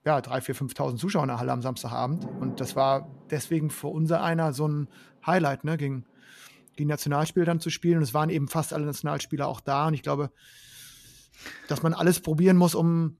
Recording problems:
rain or running water; noticeable; throughout; 20 dB below the speech

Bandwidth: 13.5 kHz